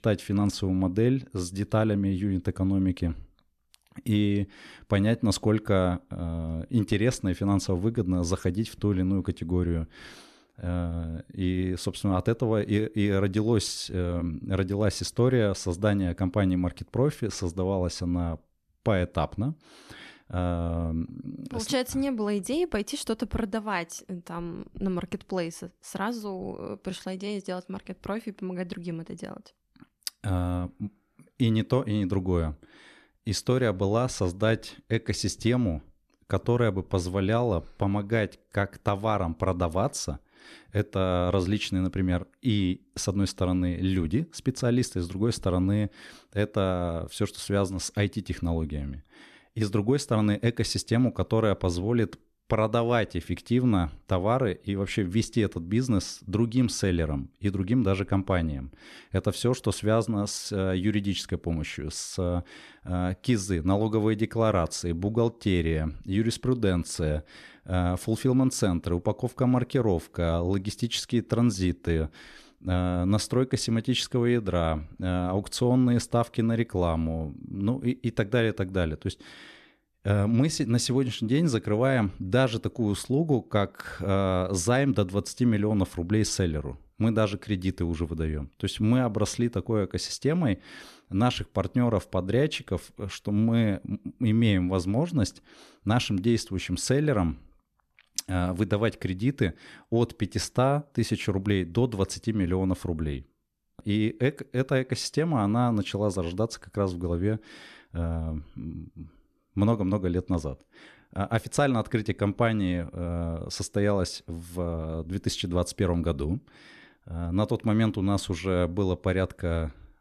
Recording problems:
none

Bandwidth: 13.5 kHz